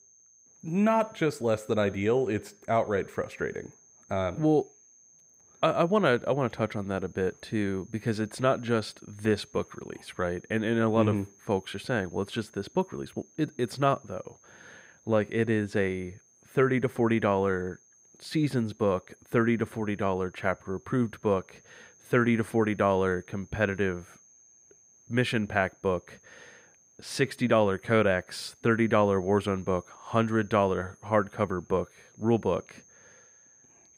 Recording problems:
high-pitched whine; faint; throughout; 6.5 kHz, 30 dB below the speech

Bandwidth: 15.5 kHz